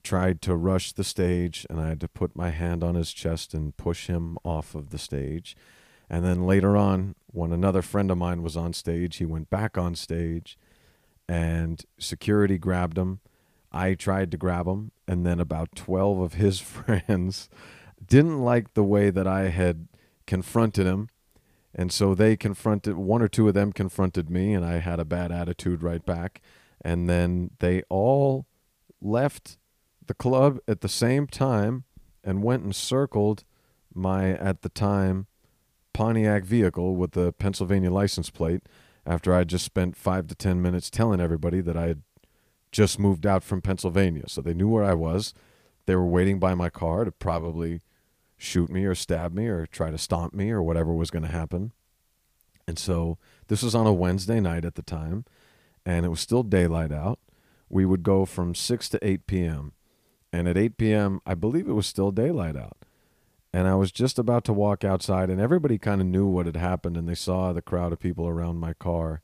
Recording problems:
none

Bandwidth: 15 kHz